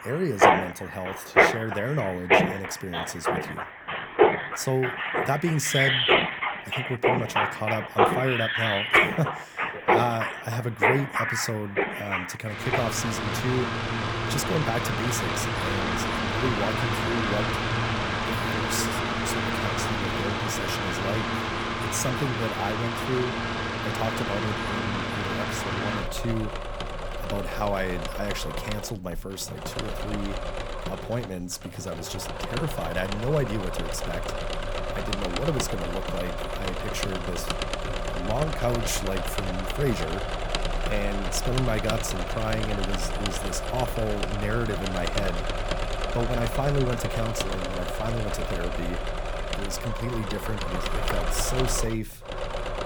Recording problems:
machinery noise; very loud; throughout; 3 dB above the speech

